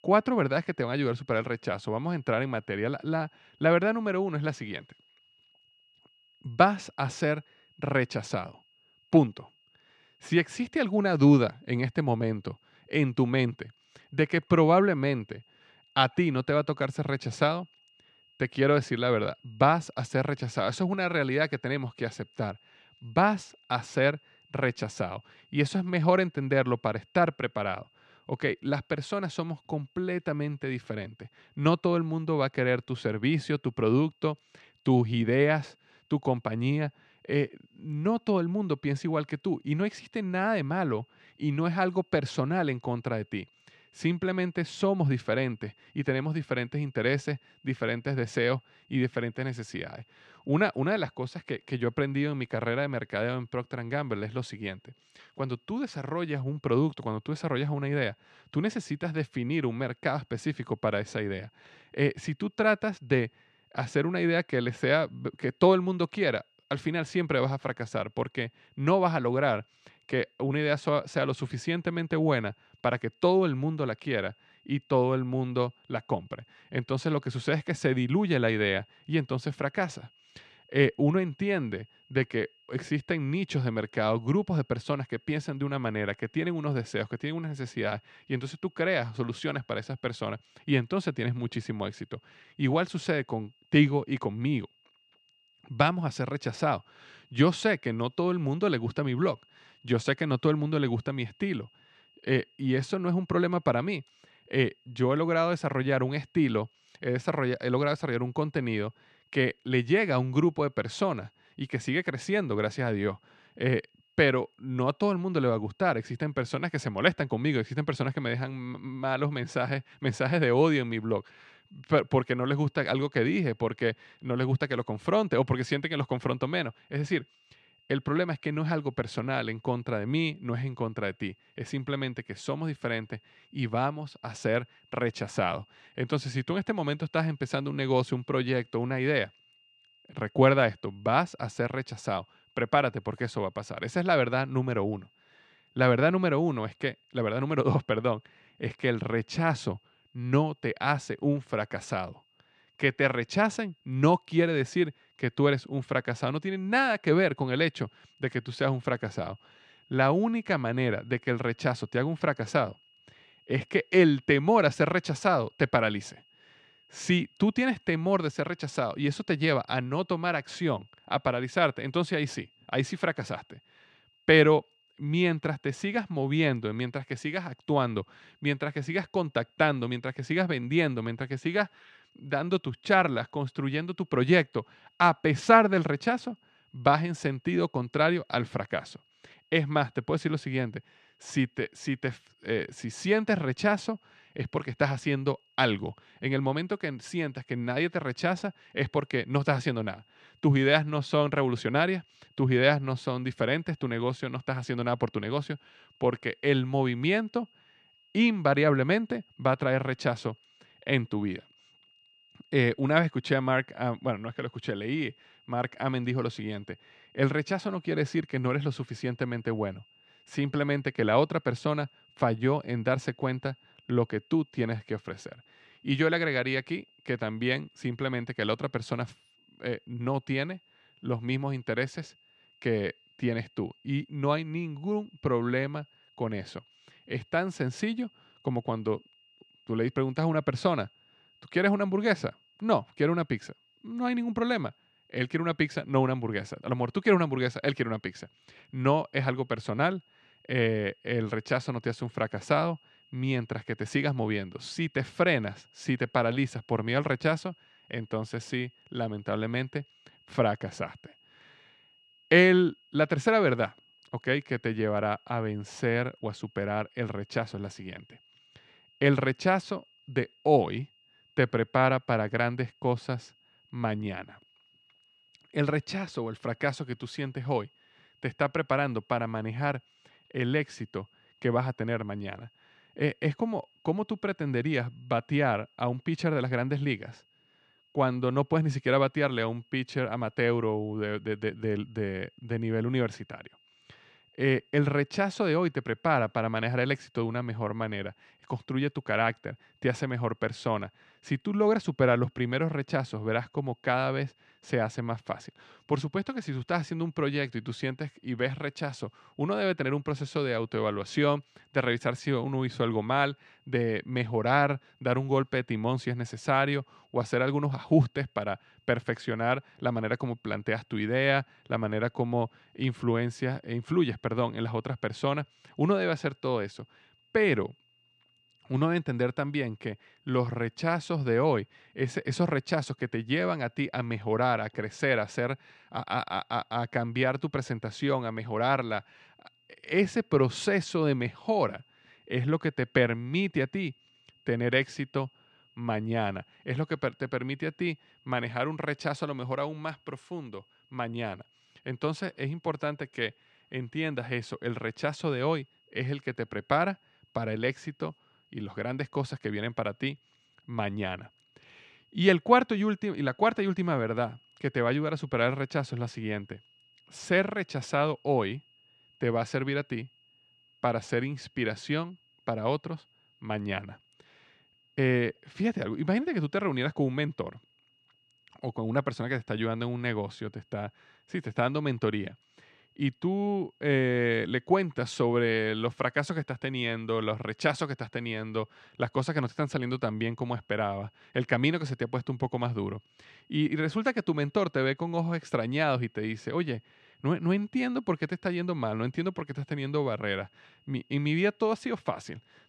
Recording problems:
high-pitched whine; faint; throughout; 3 kHz, 35 dB below the speech

